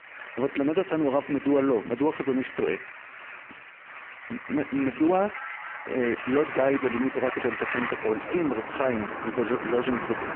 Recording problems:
phone-call audio; poor line
traffic noise; loud; throughout; 9 dB below the speech

